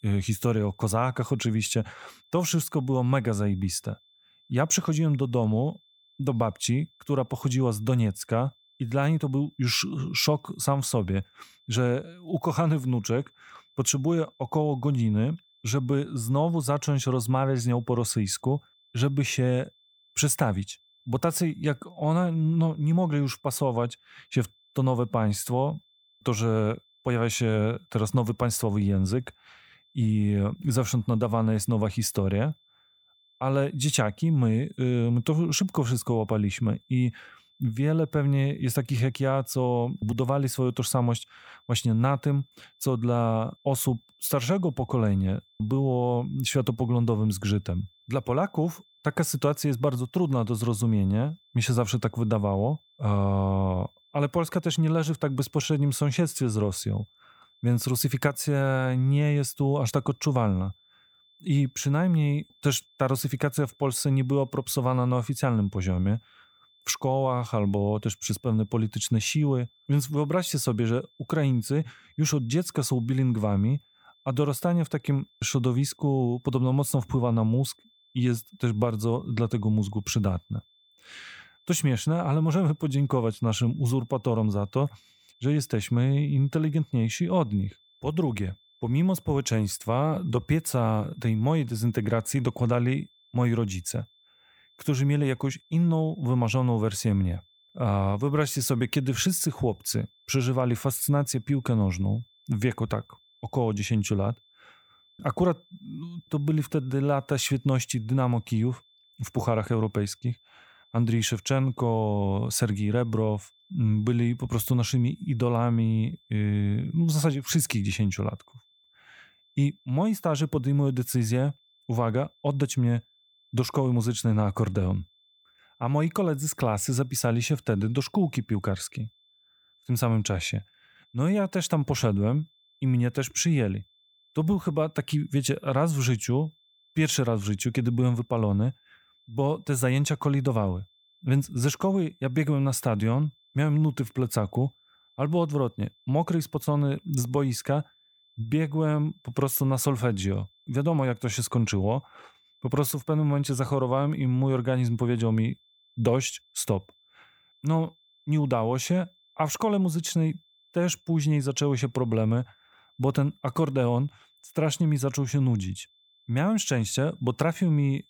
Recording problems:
high-pitched whine; faint; throughout; 3.5 kHz, 35 dB below the speech

